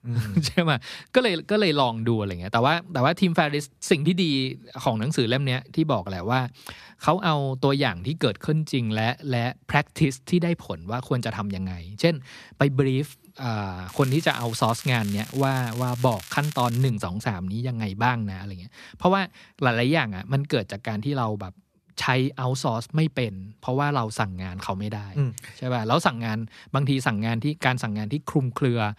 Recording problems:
crackling; noticeable; from 14 to 17 s; 15 dB below the speech

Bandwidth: 14.5 kHz